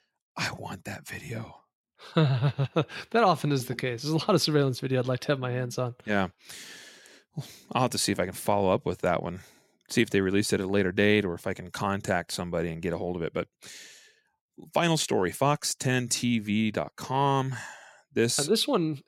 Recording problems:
none

